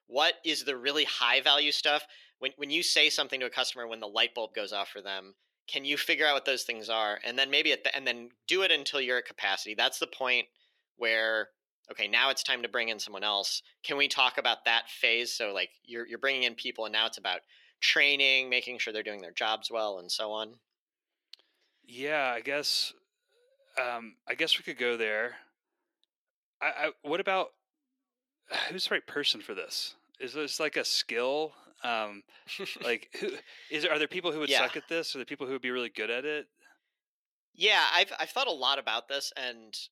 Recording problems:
thin; somewhat; fading below 350 Hz

